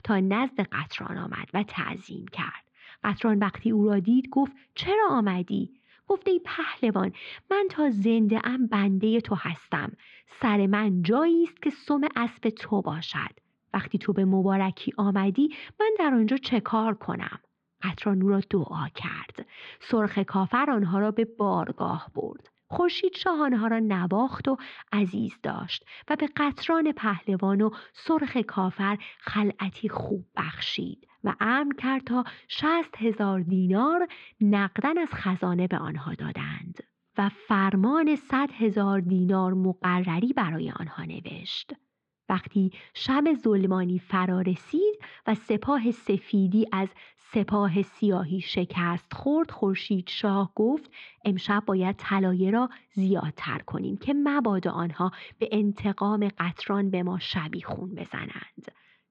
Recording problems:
muffled; slightly; fading above 4 kHz

